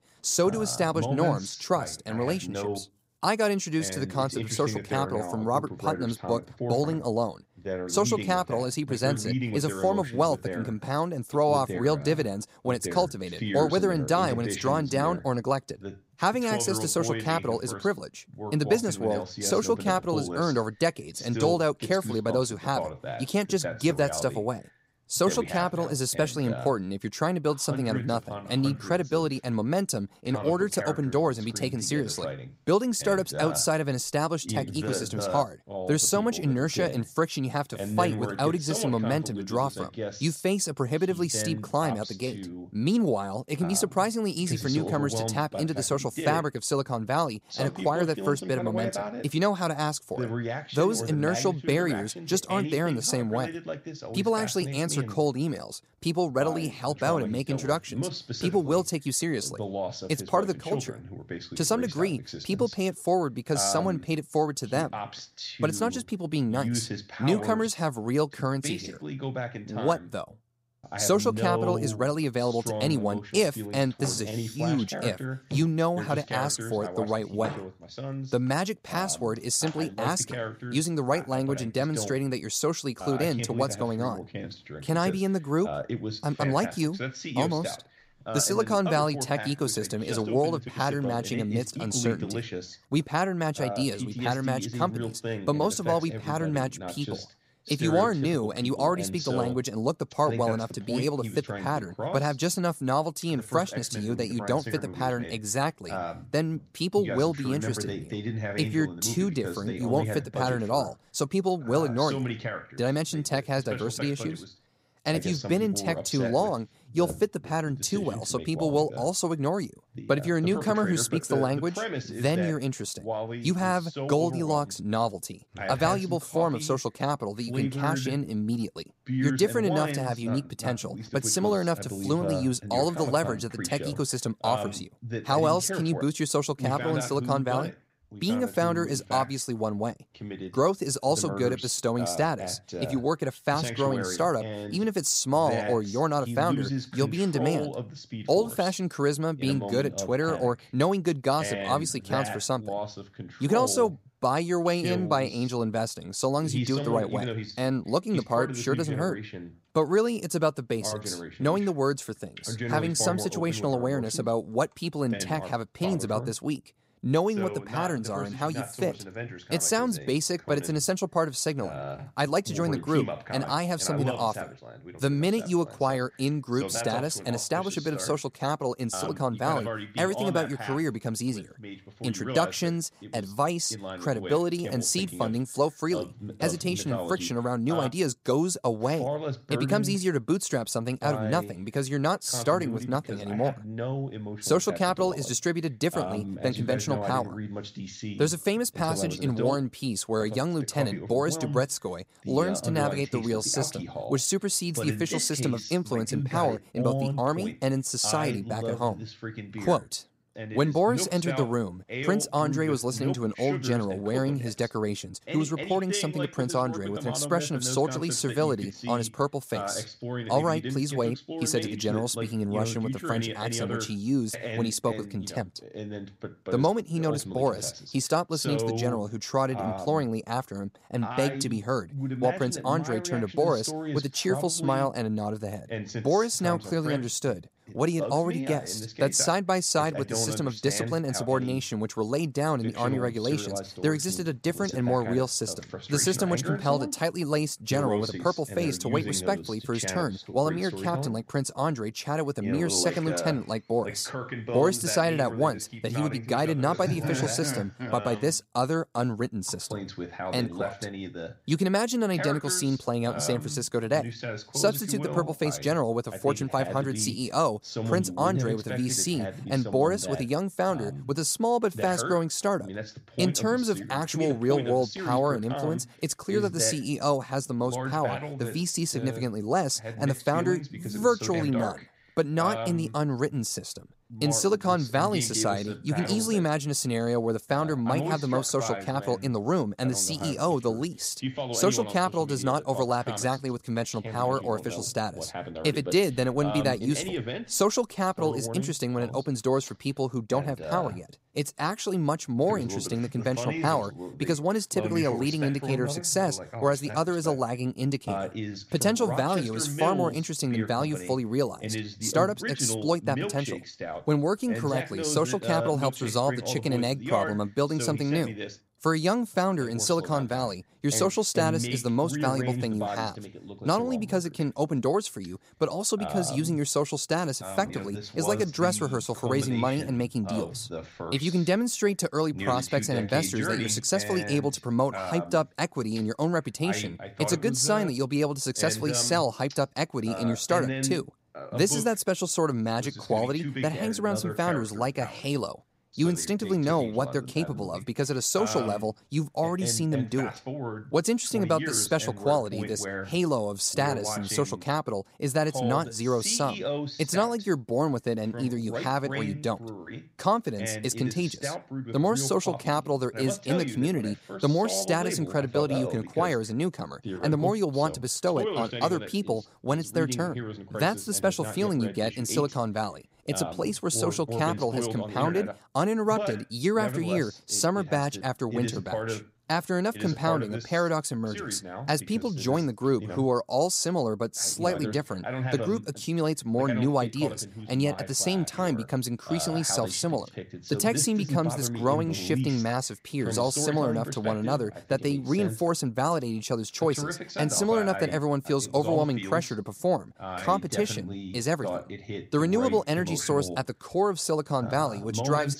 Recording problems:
voice in the background; loud; throughout; 8 dB below the speech

